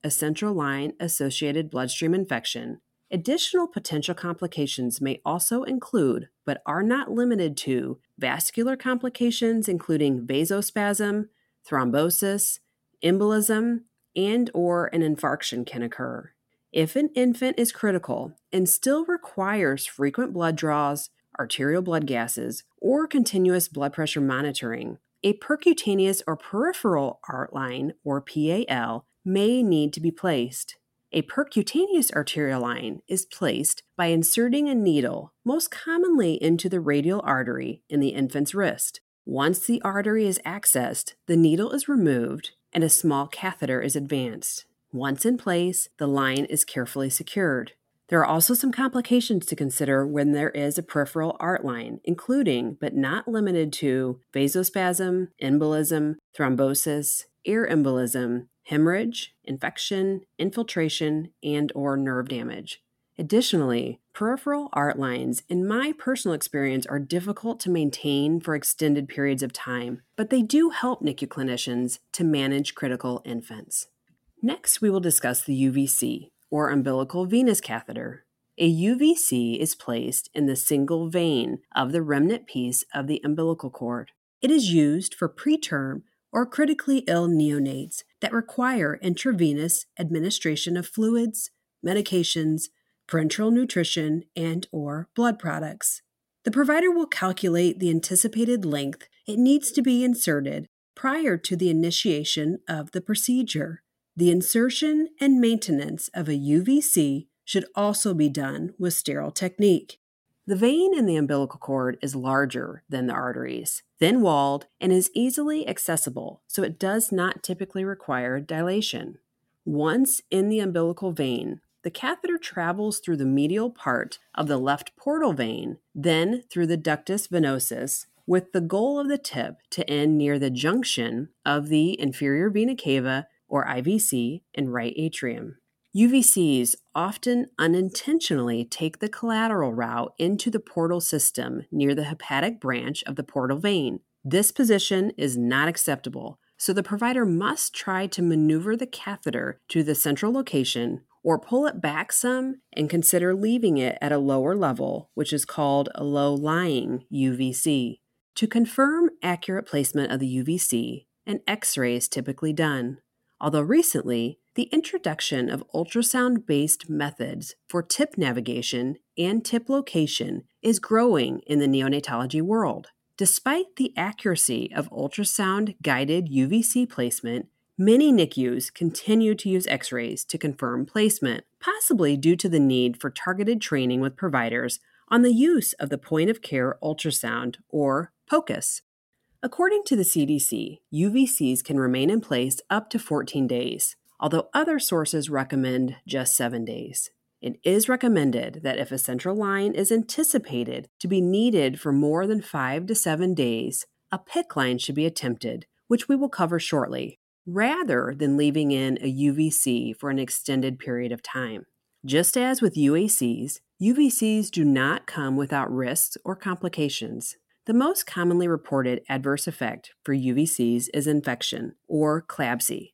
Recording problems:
none

